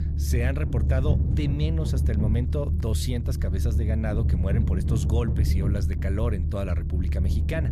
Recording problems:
low rumble; loud; throughout; 5 dB below the speech

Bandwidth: 14.5 kHz